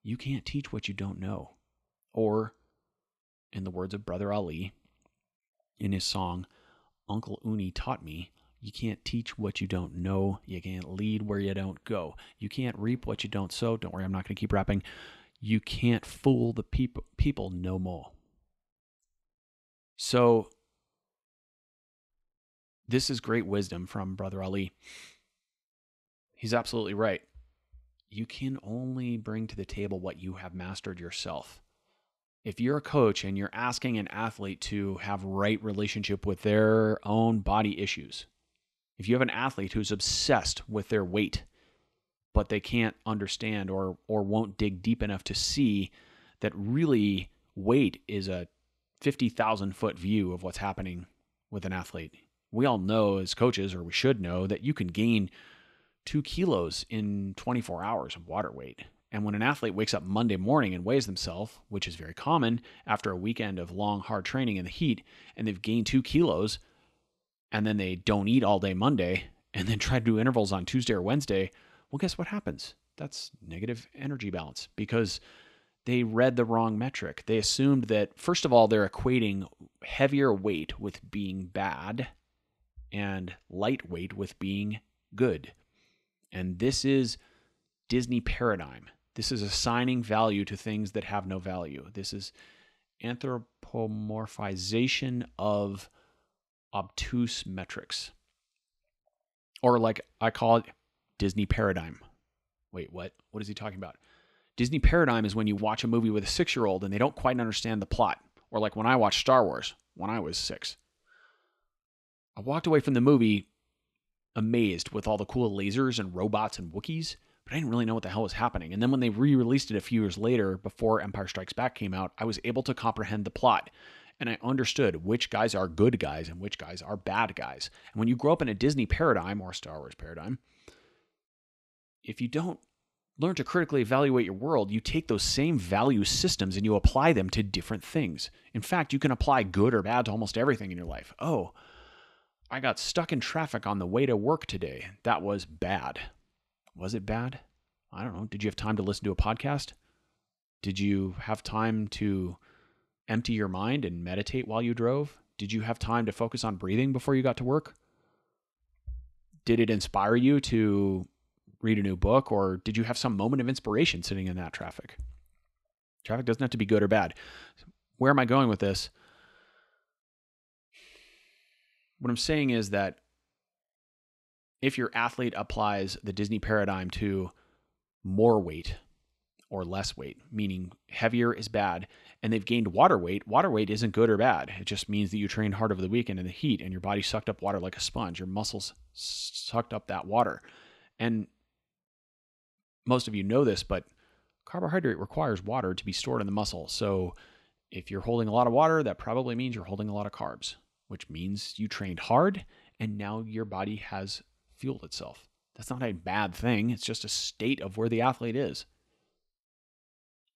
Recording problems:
none

